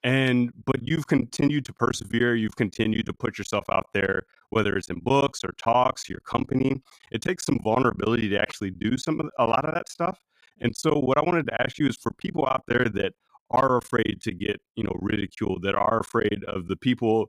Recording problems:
choppy; very; 16% of the speech affected

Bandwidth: 14.5 kHz